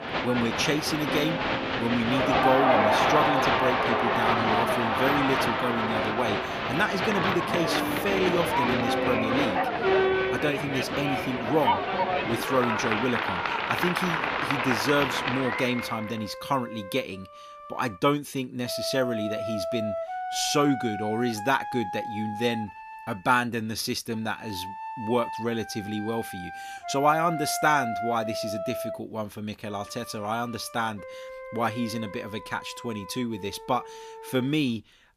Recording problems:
crowd noise; very loud; until 16 s; 3 dB above the speech
background music; loud; throughout; 8 dB below the speech

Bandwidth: 15 kHz